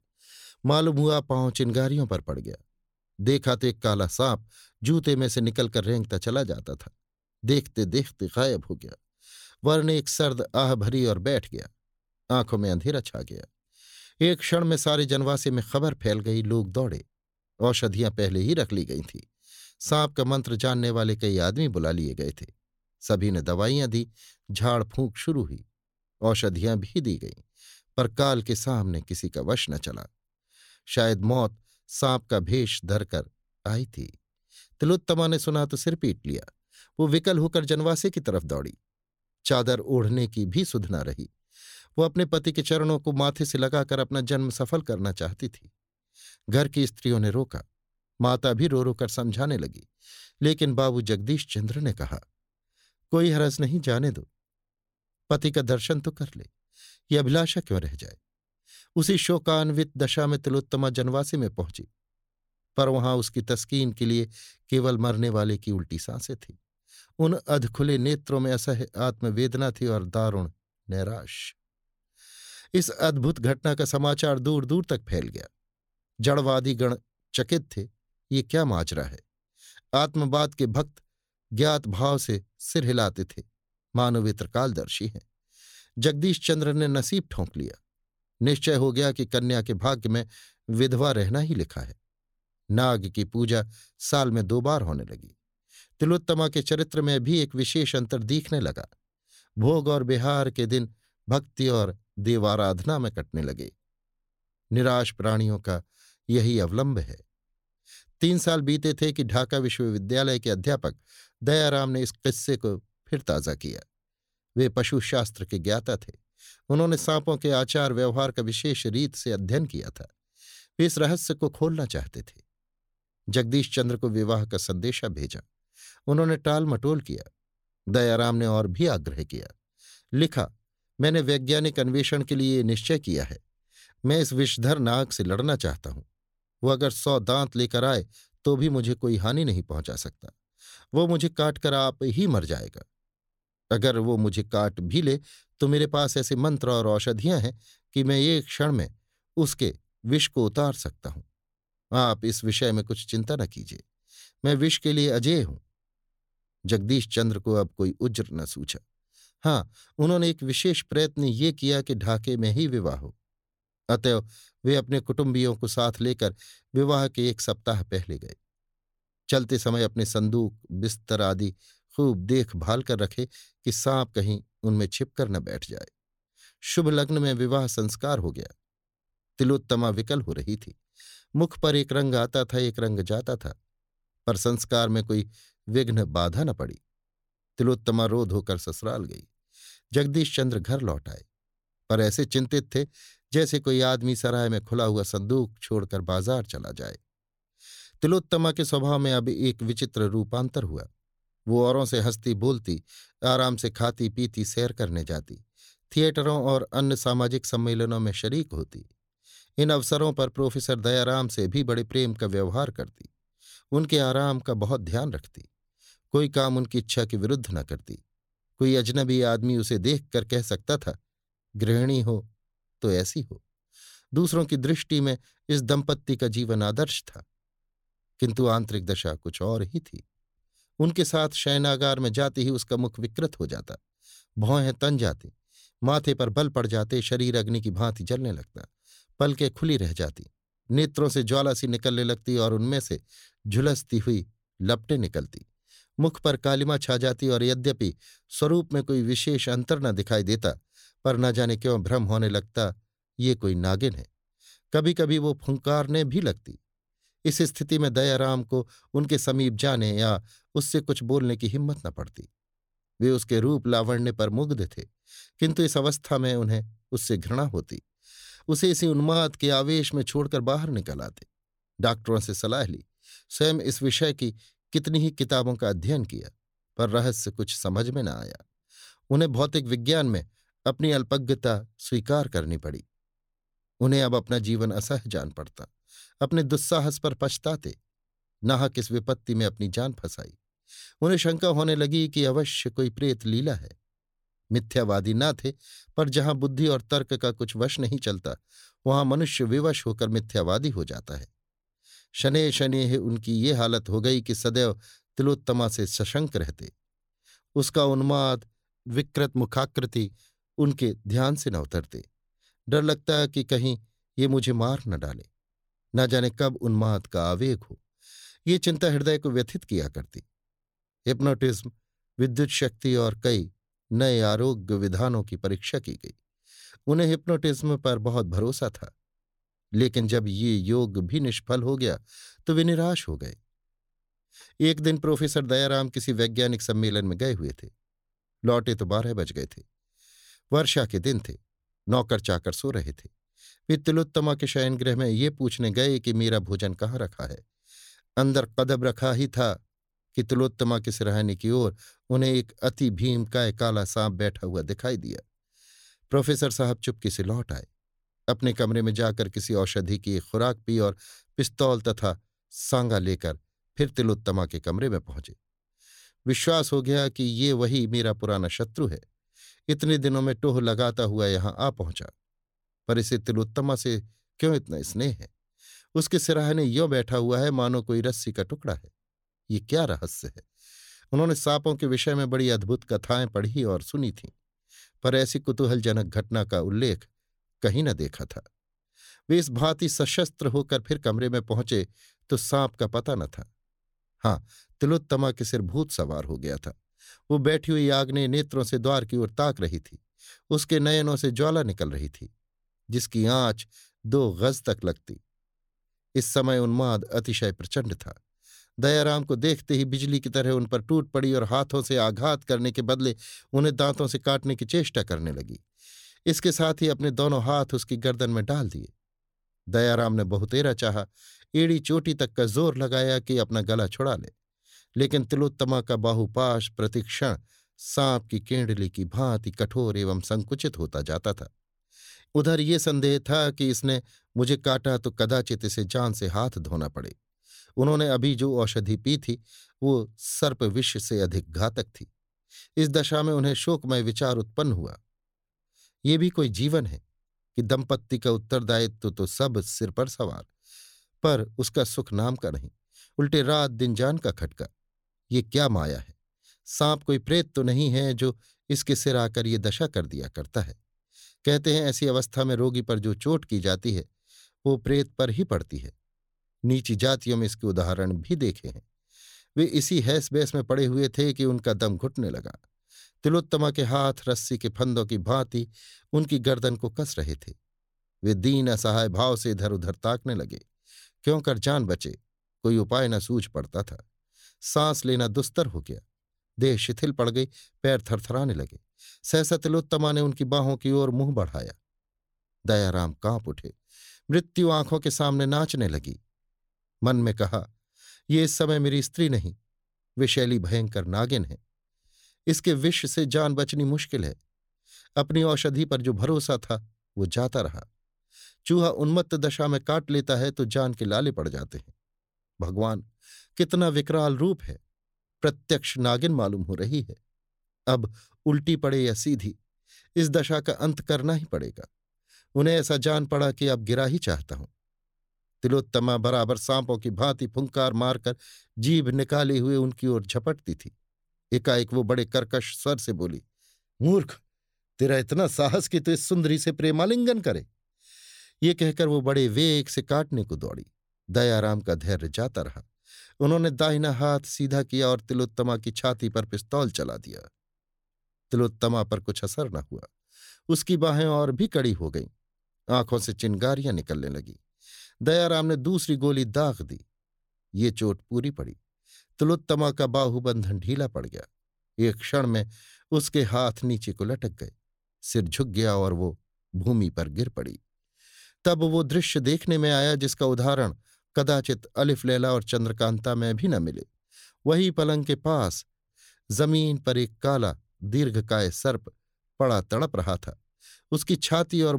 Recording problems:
abrupt cut into speech; at the end

